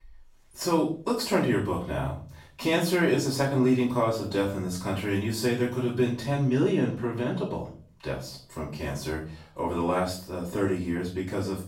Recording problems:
off-mic speech; far
room echo; noticeable; dies away in 0.4 s

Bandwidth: 16 kHz